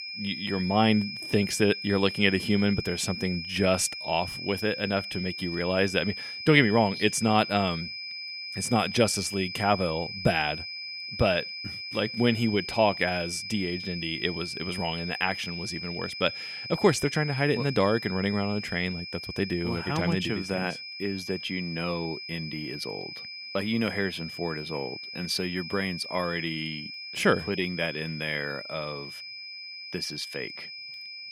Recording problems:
high-pitched whine; loud; throughout; 5 kHz, 8 dB below the speech

